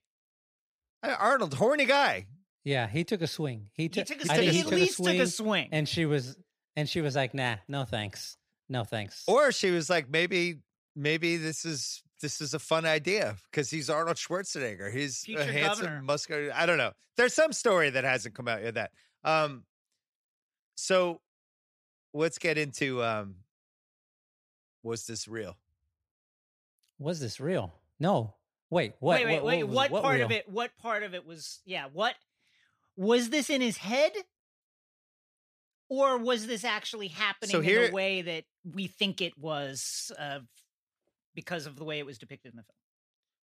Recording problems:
none

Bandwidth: 15 kHz